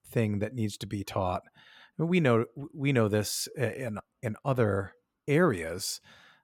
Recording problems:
none

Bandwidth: 17 kHz